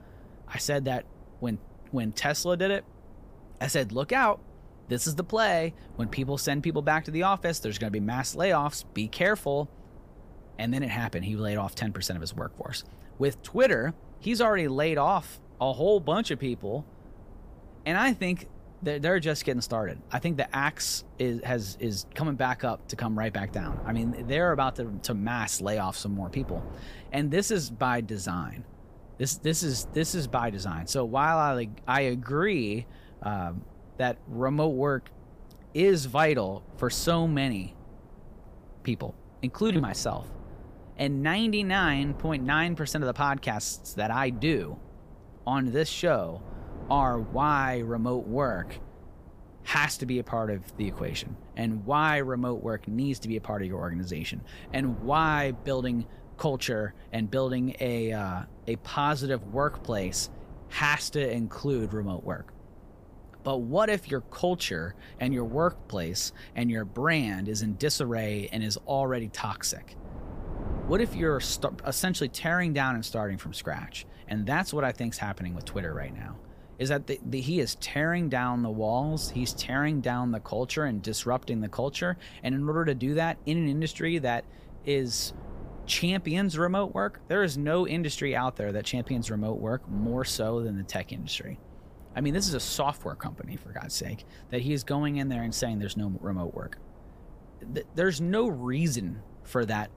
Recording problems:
wind noise on the microphone; occasional gusts; 25 dB below the speech

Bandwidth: 15 kHz